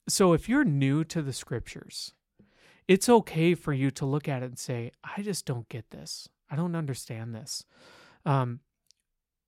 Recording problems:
none

